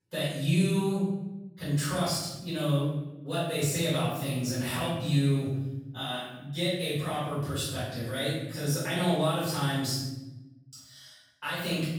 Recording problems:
room echo; strong; dies away in 0.9 s
off-mic speech; far

